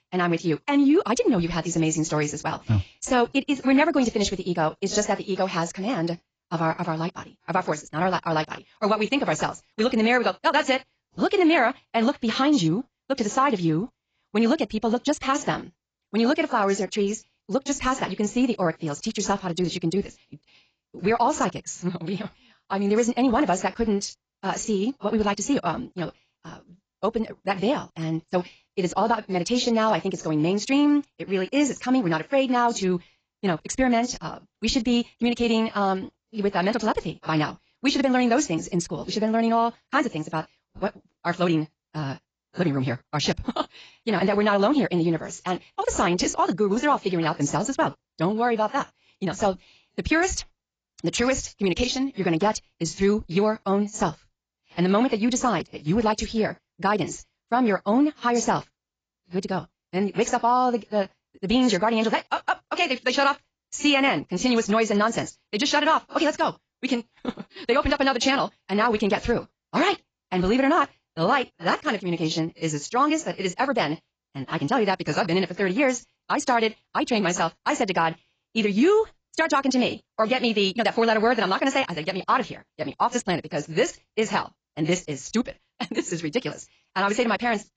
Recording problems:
garbled, watery; badly; nothing above 7.5 kHz
wrong speed, natural pitch; too fast; 1.8 times normal speed

